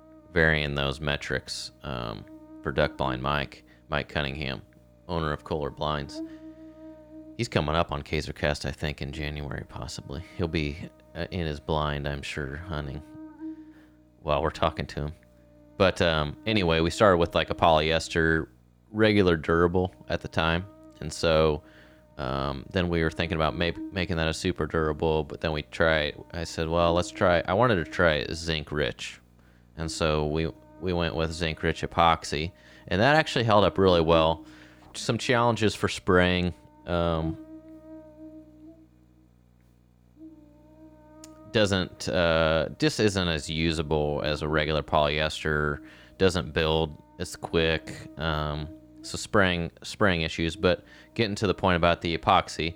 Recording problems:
electrical hum; faint; throughout; 60 Hz, 25 dB below the speech

